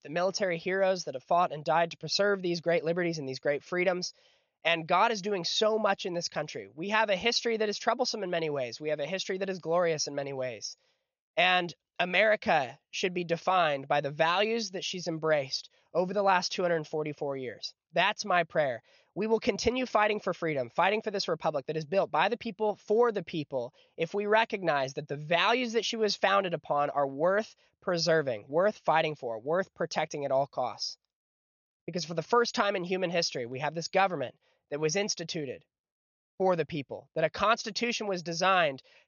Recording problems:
high frequencies cut off; noticeable; nothing above 6.5 kHz

